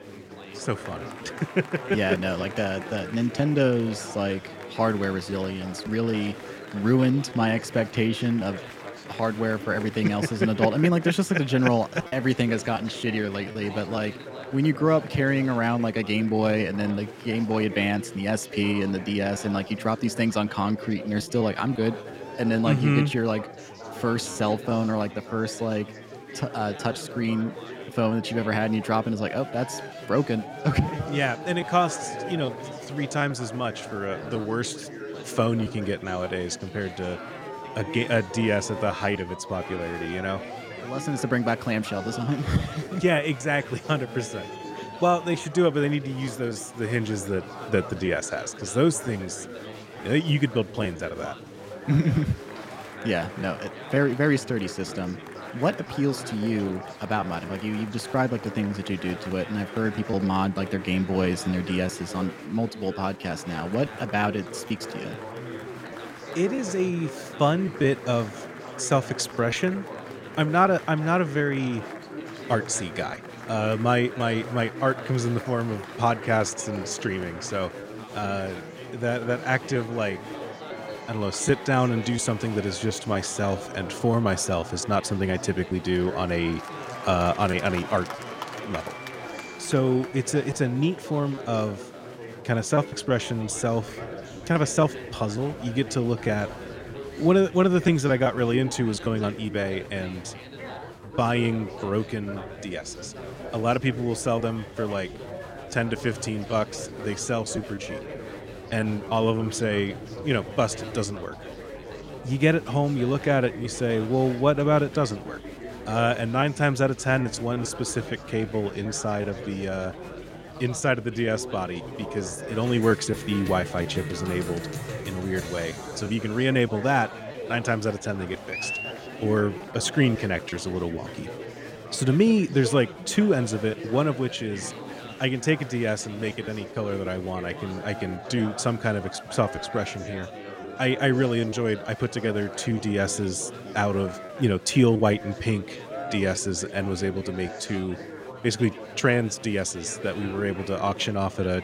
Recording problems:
chatter from many people; noticeable; throughout; 10 dB below the speech
choppy; occasionally; 3% of the speech affected

